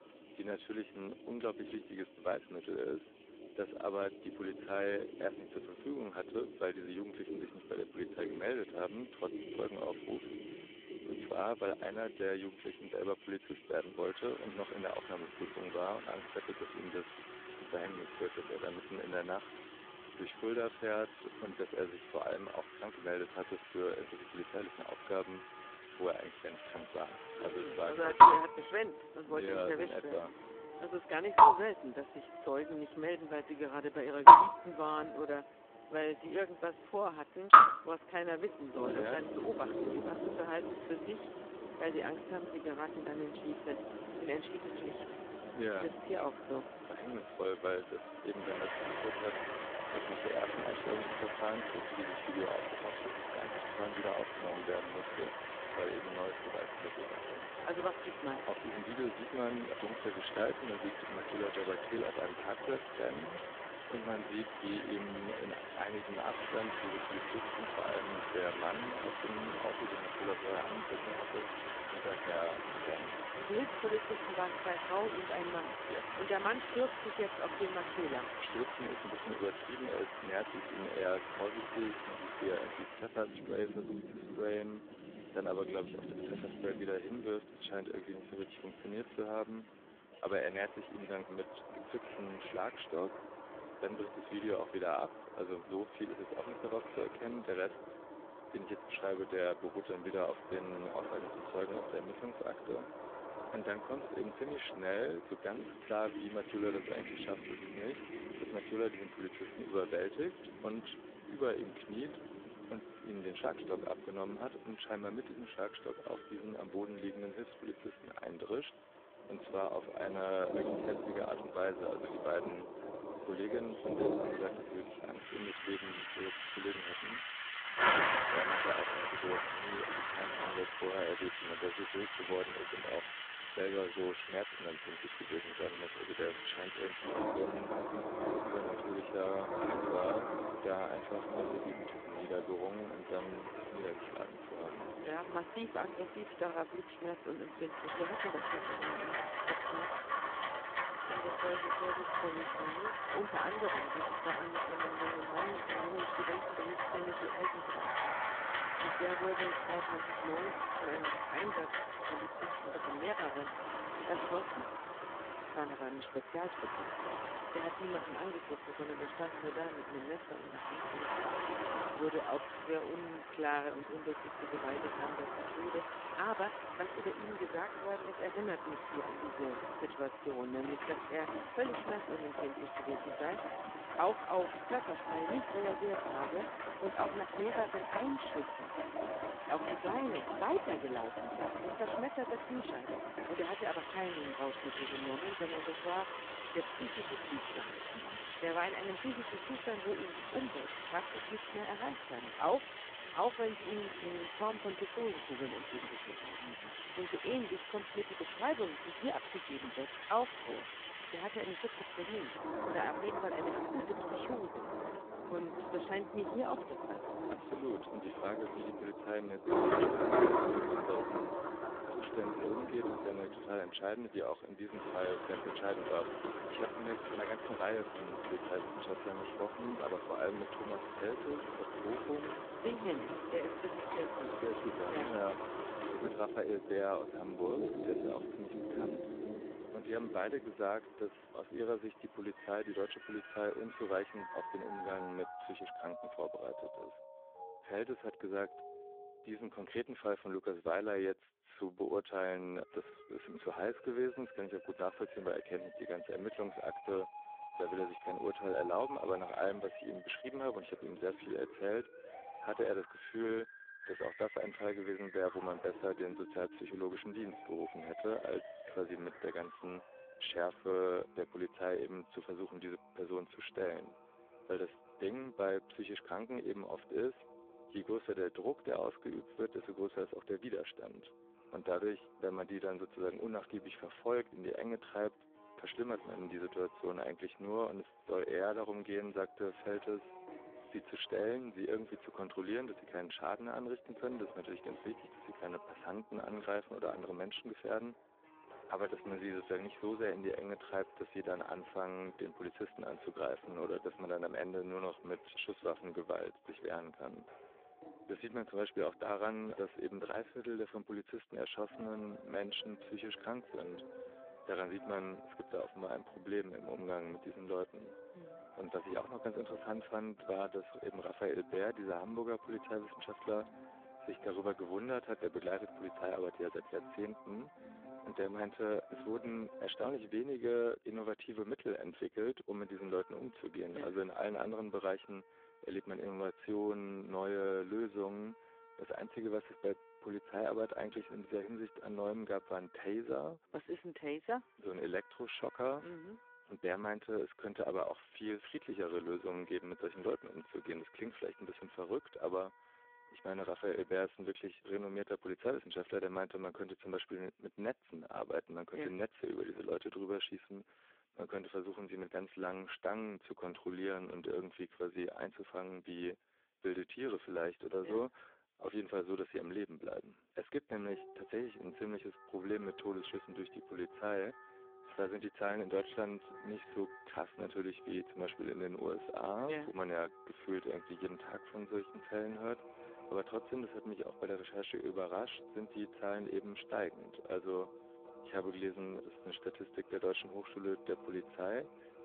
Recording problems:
phone-call audio; poor line
rain or running water; very loud; until 4:05; 4 dB above the speech
background music; noticeable; throughout; 10 dB below the speech

